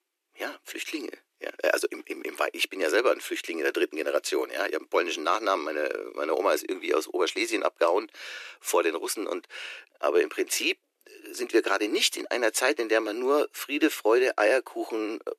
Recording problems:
thin; very; fading below 300 Hz

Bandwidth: 14 kHz